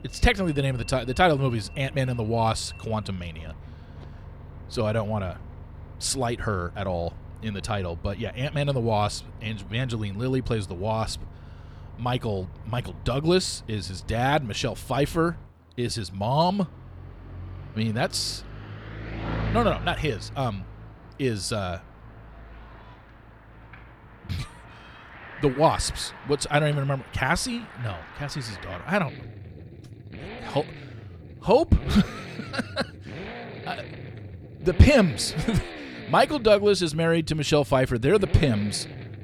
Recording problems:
traffic noise; noticeable; throughout; 15 dB below the speech

